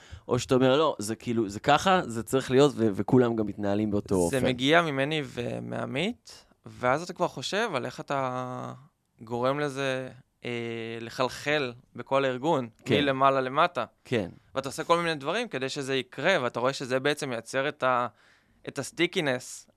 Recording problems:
none

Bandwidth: 13.5 kHz